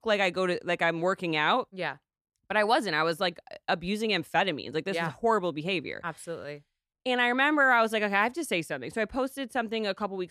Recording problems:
none

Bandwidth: 14 kHz